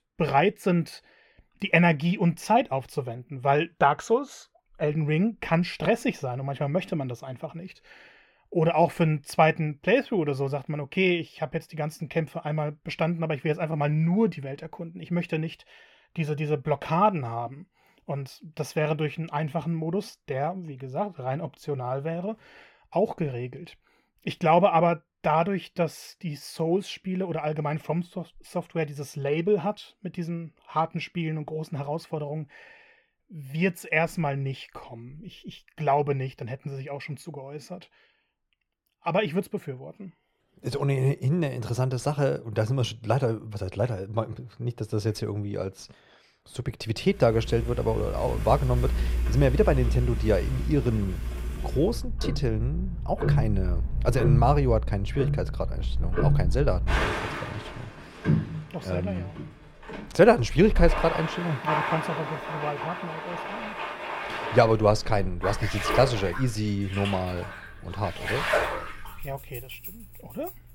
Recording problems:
muffled; slightly; fading above 3.5 kHz
household noises; loud; from 47 s on; 3 dB below the speech

